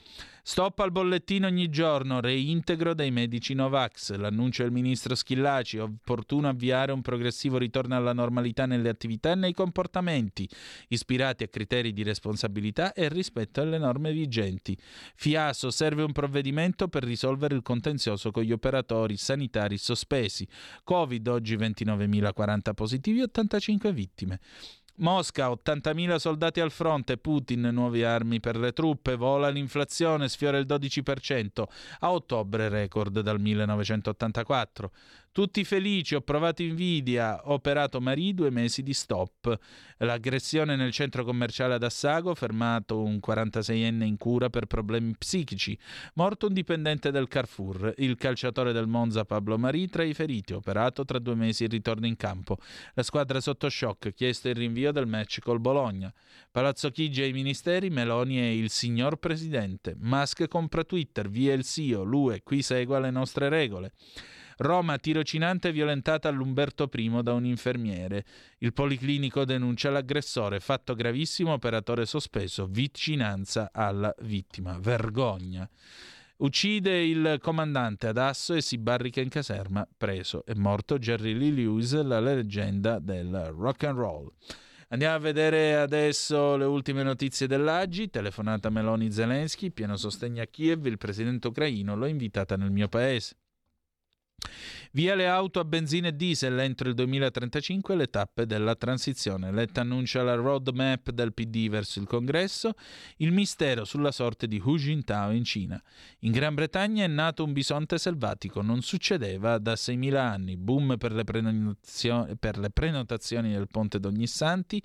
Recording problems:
none

